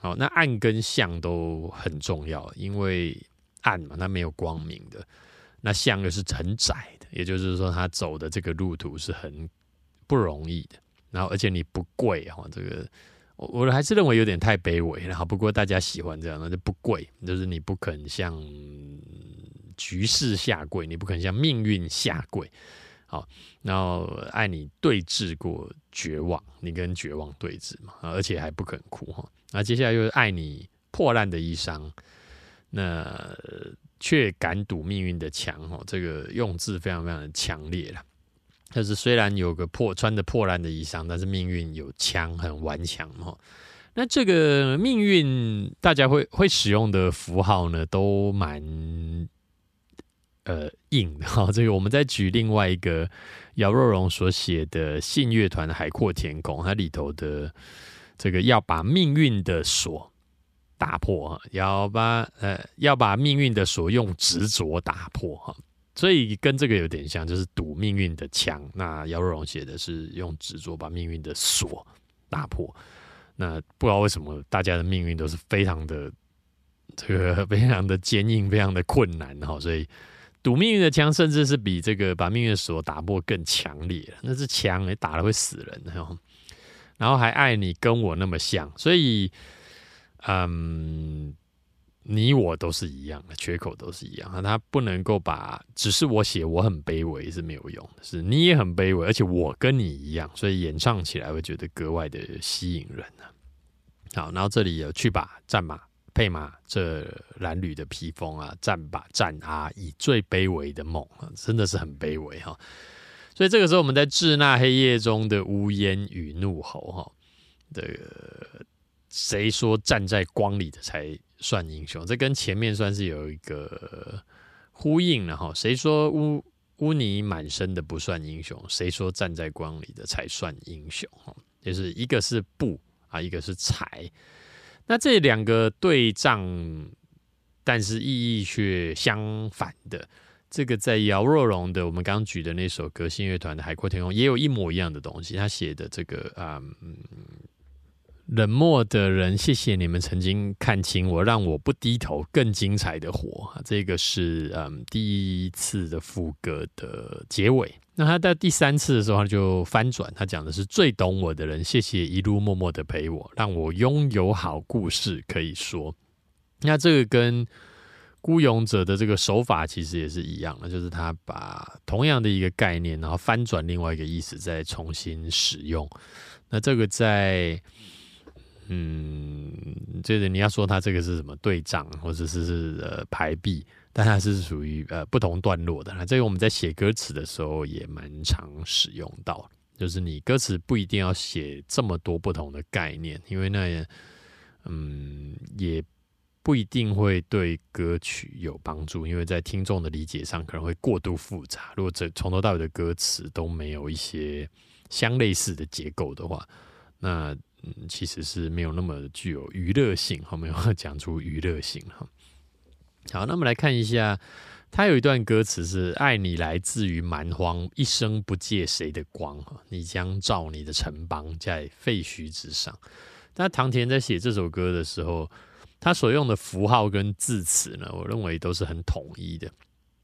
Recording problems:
none

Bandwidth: 14.5 kHz